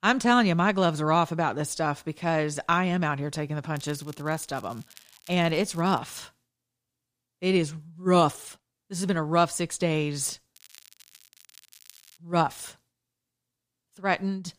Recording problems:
crackling; faint; from 4 to 6 s and from 11 to 12 s; 25 dB below the speech

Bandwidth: 15 kHz